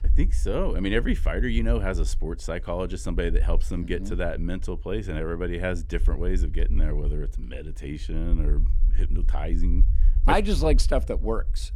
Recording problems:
low rumble; faint; throughout; 20 dB below the speech

